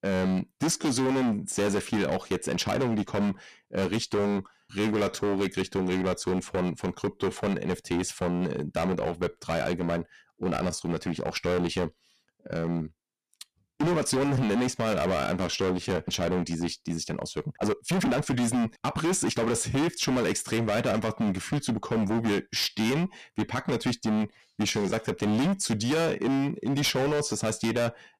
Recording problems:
distortion; heavy; 20% of the sound clipped
uneven, jittery; strongly; from 0.5 to 25 s

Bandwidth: 14.5 kHz